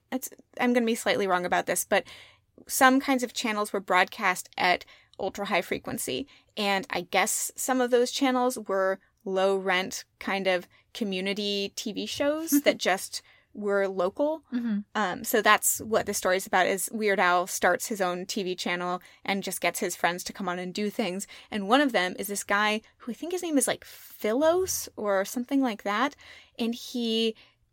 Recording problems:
none

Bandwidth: 16.5 kHz